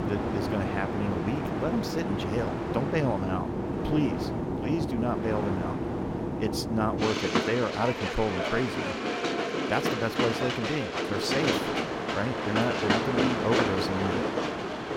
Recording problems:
train or aircraft noise; very loud; throughout; 1 dB above the speech

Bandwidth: 16.5 kHz